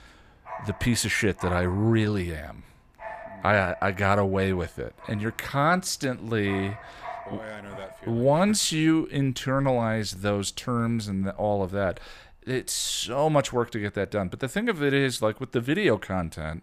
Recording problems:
animal sounds; noticeable; throughout; 20 dB below the speech

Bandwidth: 15 kHz